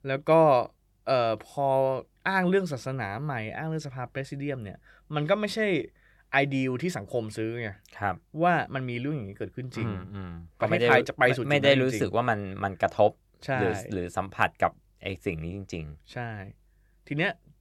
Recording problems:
none

